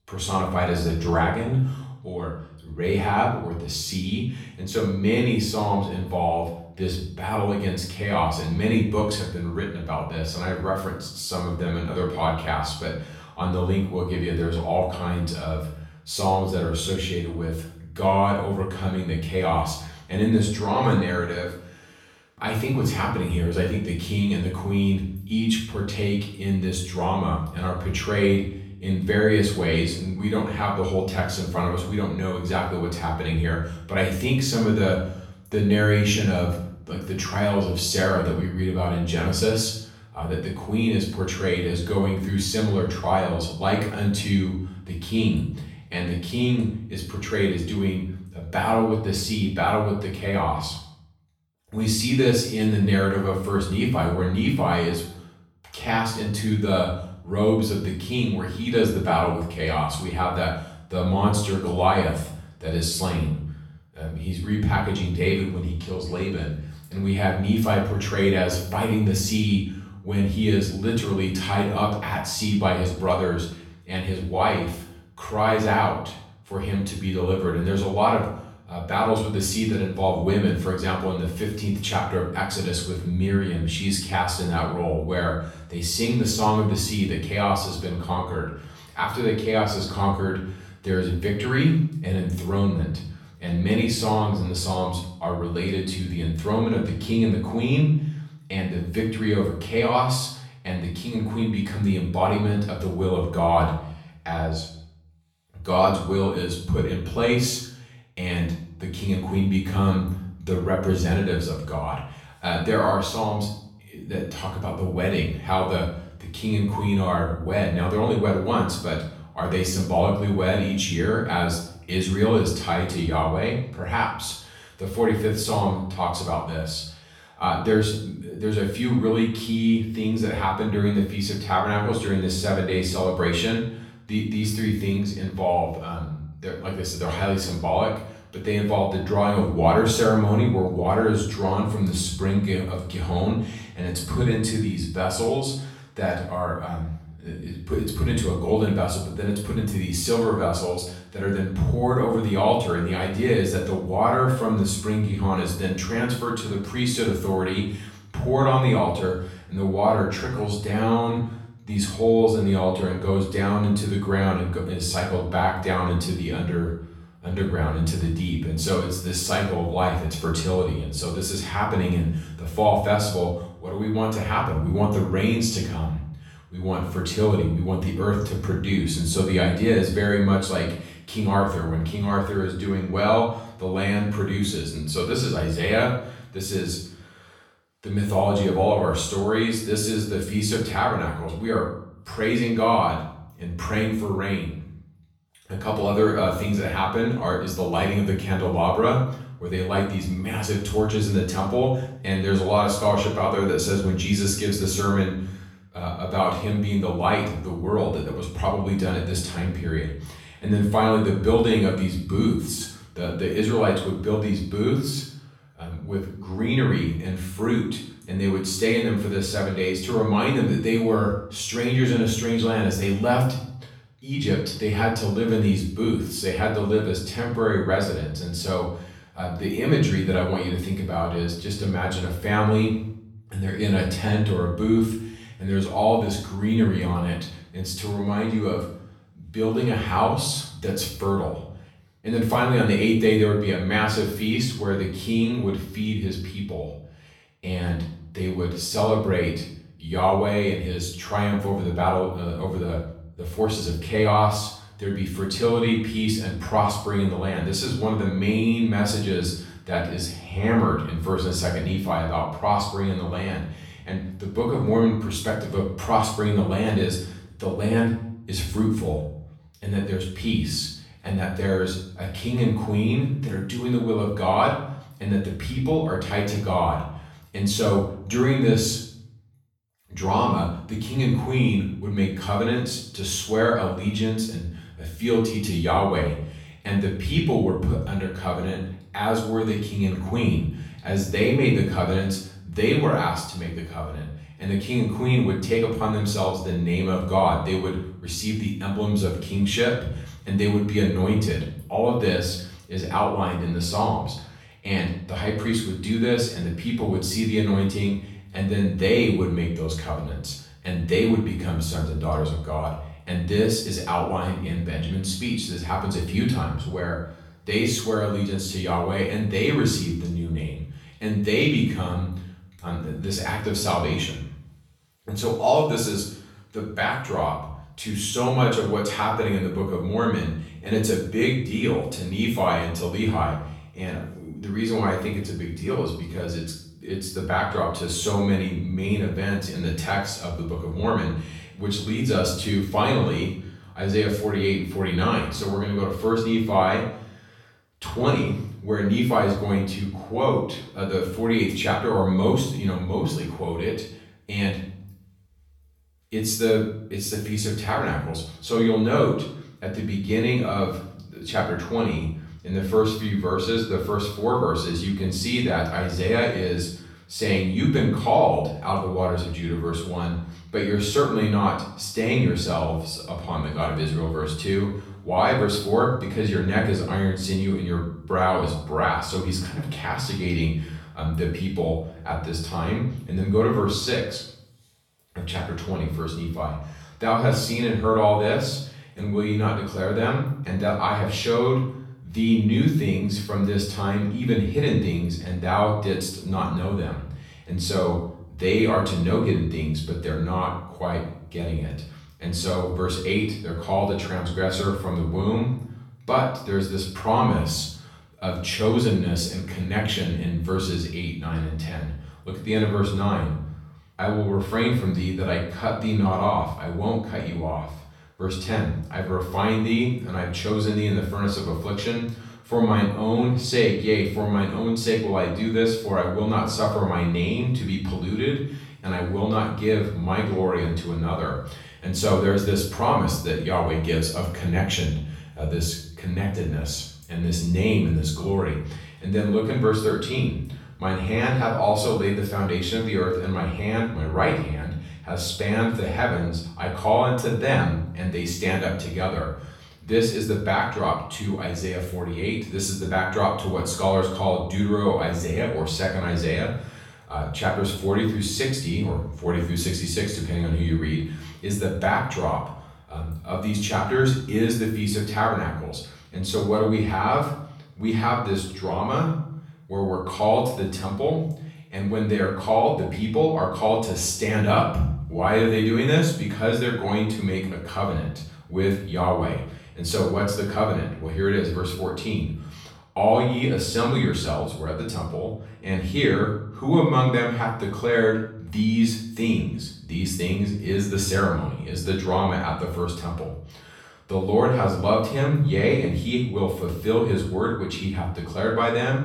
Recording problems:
off-mic speech; far
room echo; noticeable; dies away in 0.6 s

